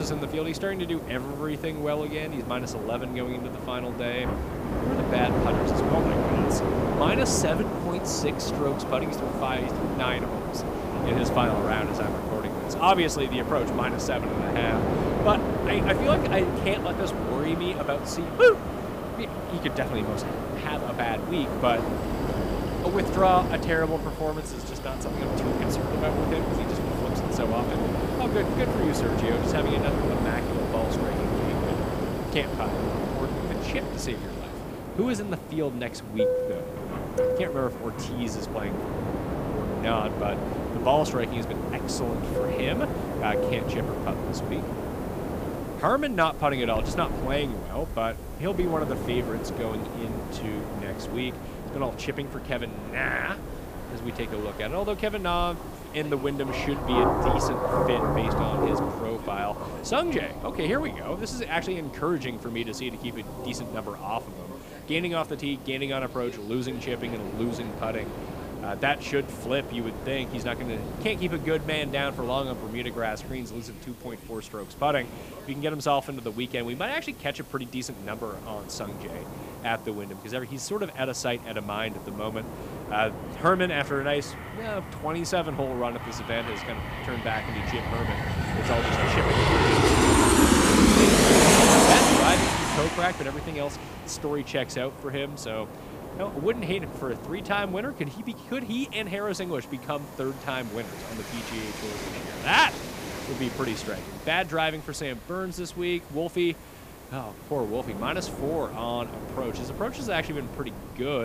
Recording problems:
train or aircraft noise; very loud; throughout; 2 dB above the speech
rain or running water; loud; throughout; 9 dB below the speech
hiss; faint; throughout; 25 dB below the speech
abrupt cut into speech; at the start and the end

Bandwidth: 15 kHz